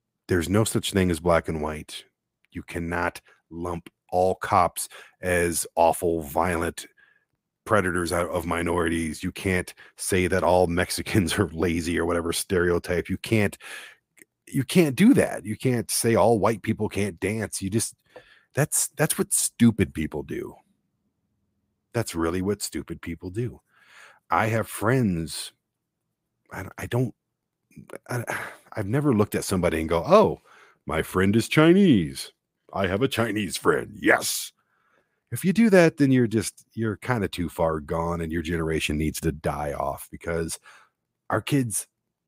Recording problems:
none

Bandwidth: 15.5 kHz